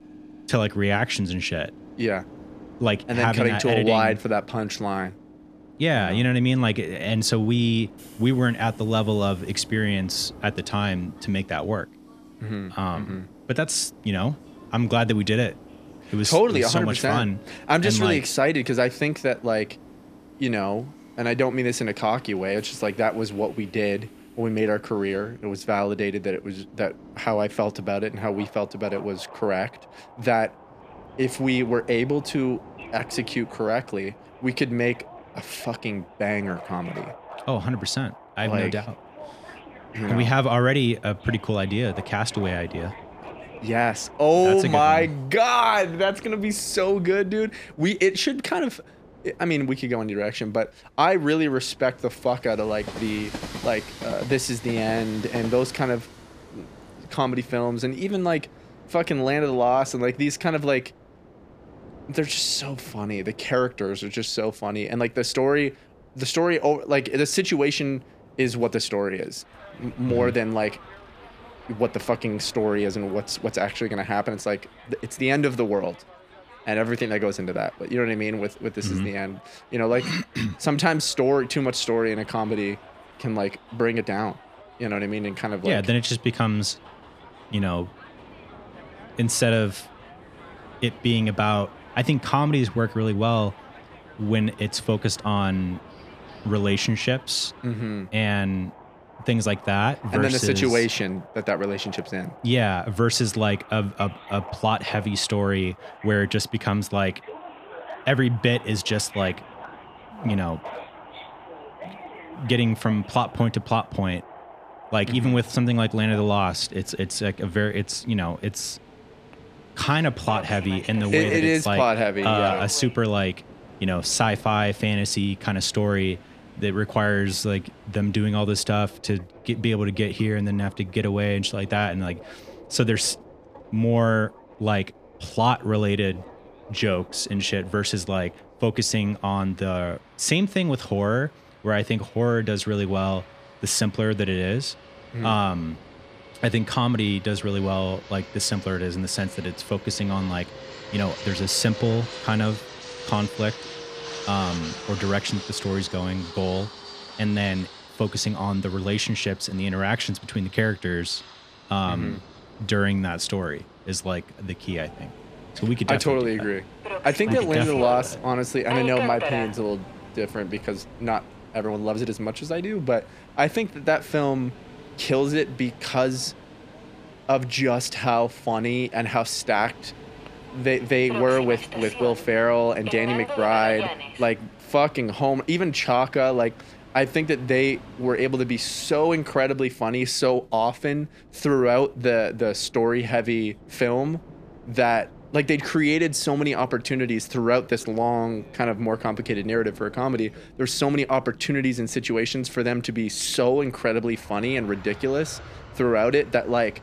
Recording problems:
train or aircraft noise; noticeable; throughout; 15 dB below the speech

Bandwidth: 14.5 kHz